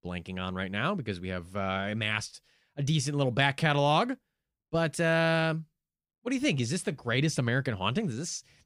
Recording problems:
none

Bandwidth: 15.5 kHz